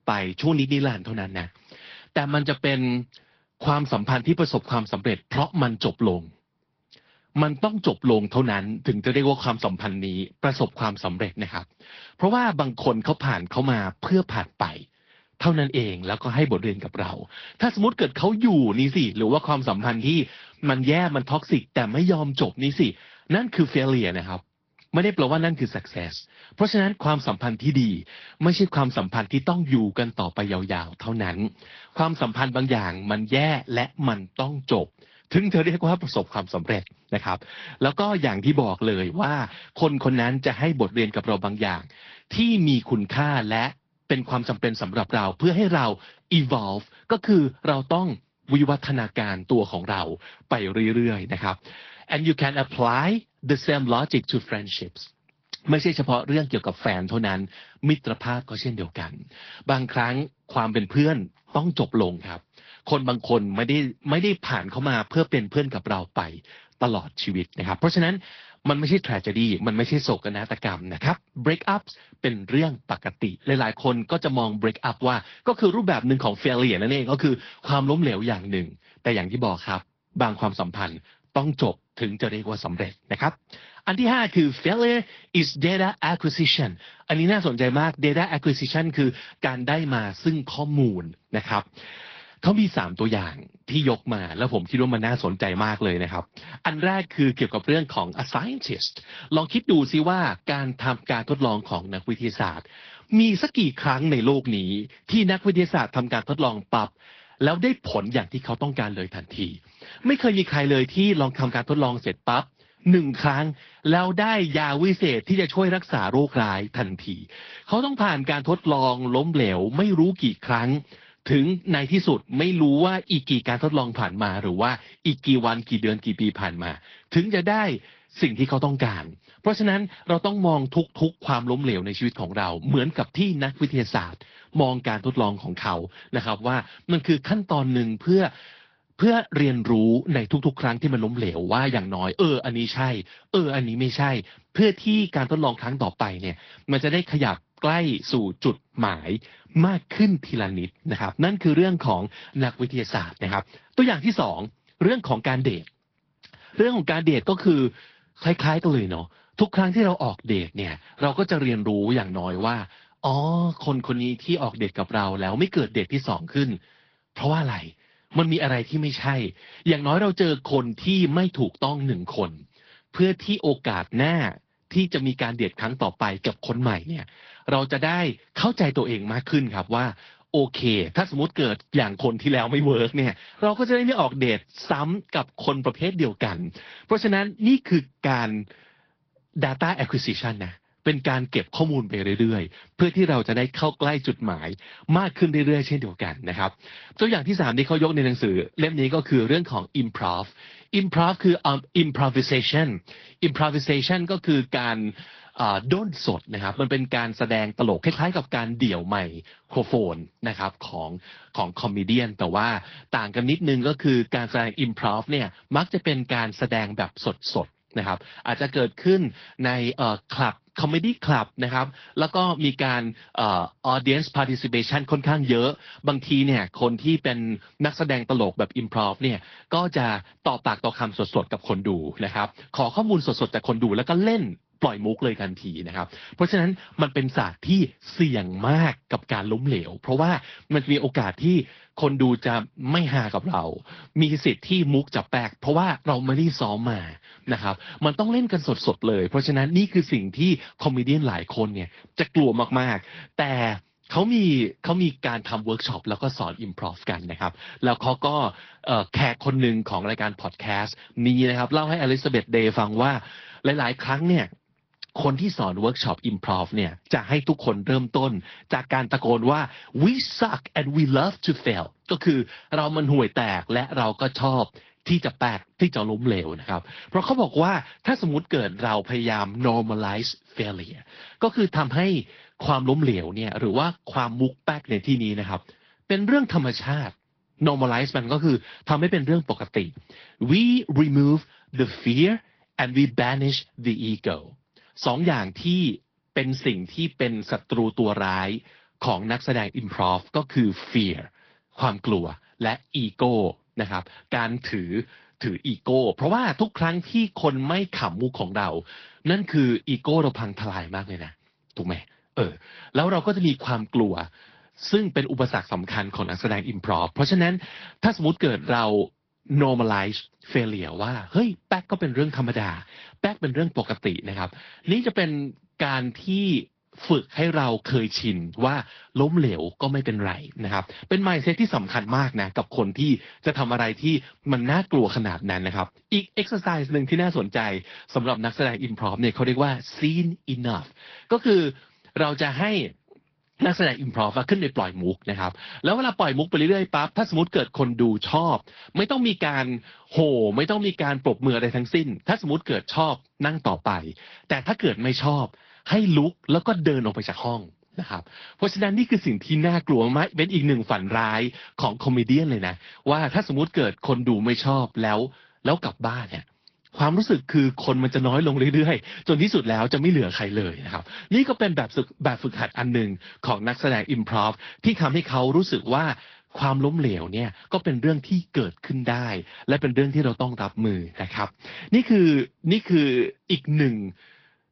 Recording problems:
high frequencies cut off; noticeable; nothing above 5.5 kHz
garbled, watery; slightly

